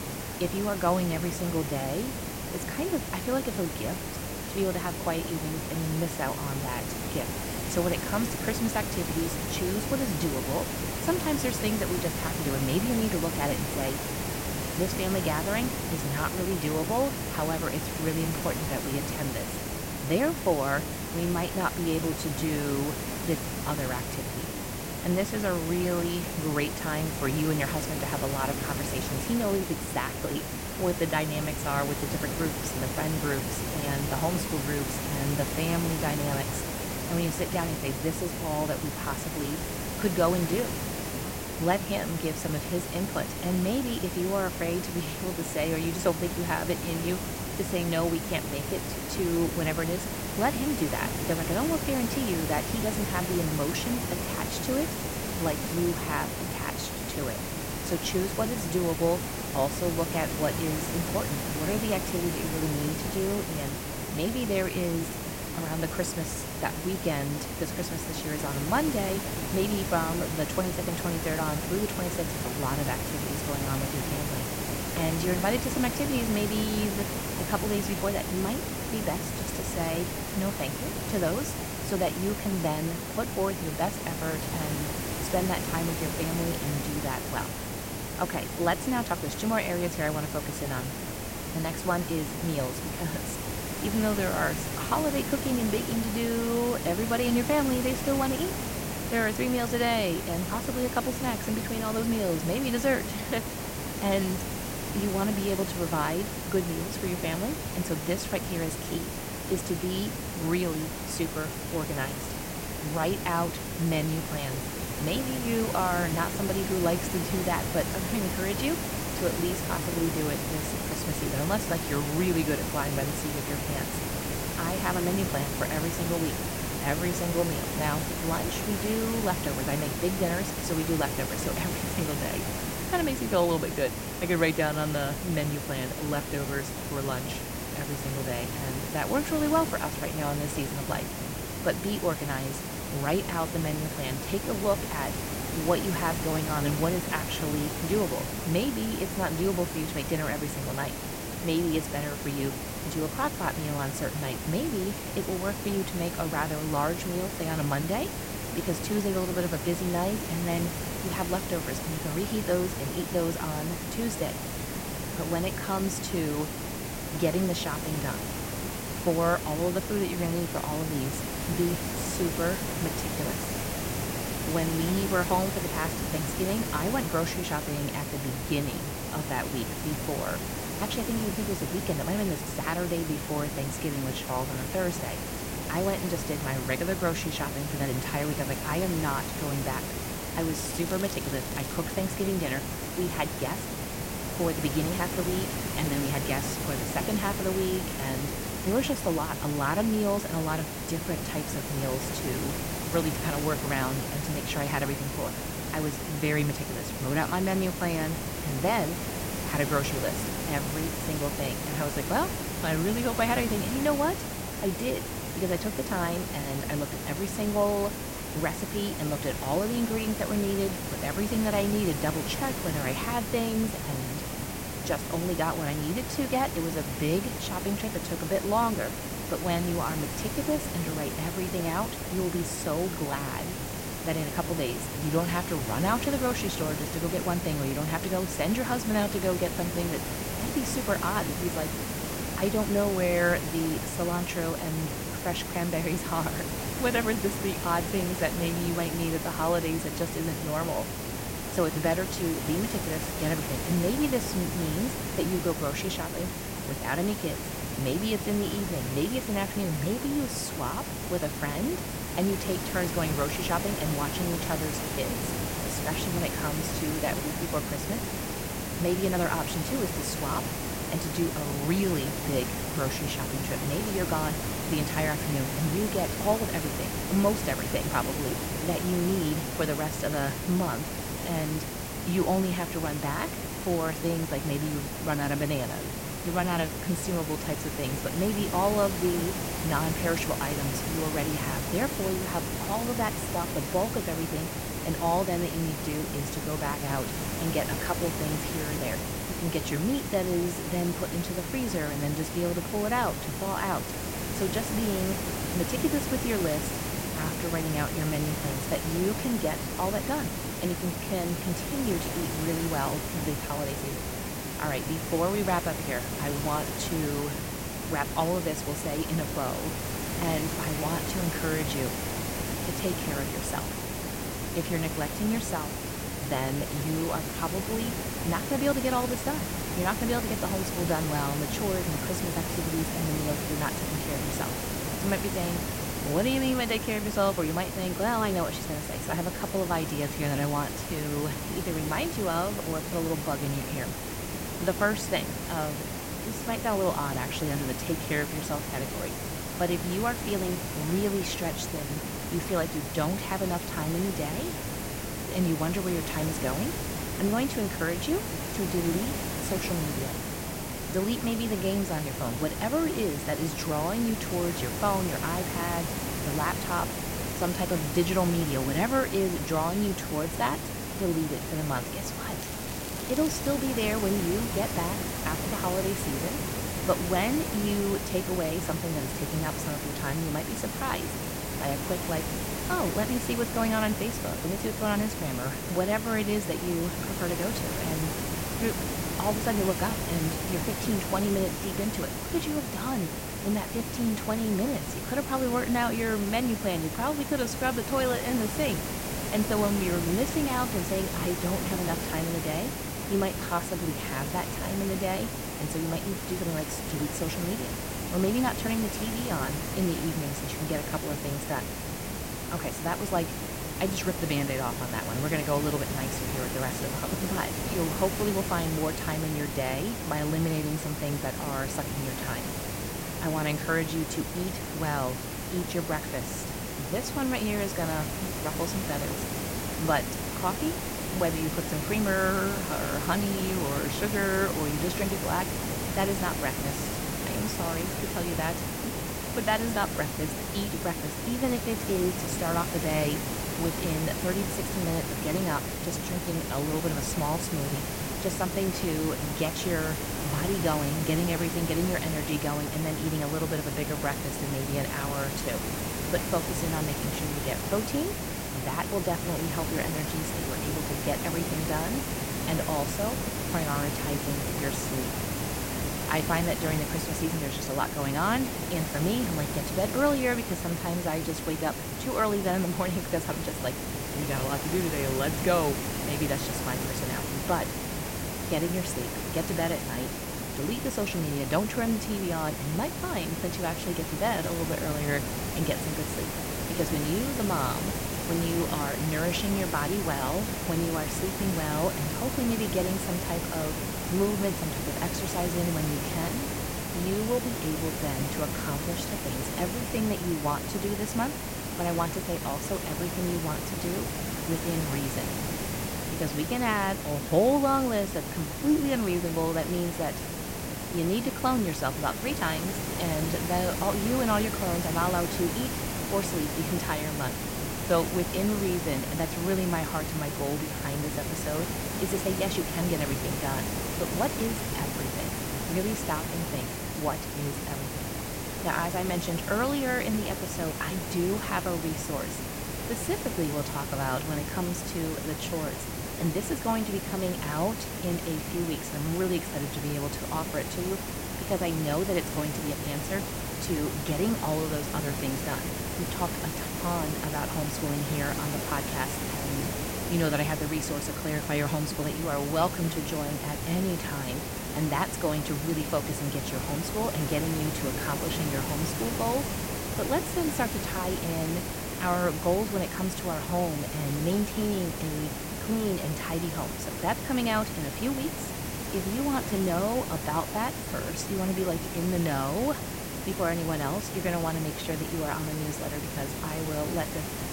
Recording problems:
hiss; loud; throughout; 2 dB below the speech
crackling; noticeable; from 3:11 to 3:12 and from 6:12 to 6:14; 10 dB below the speech

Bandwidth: 16 kHz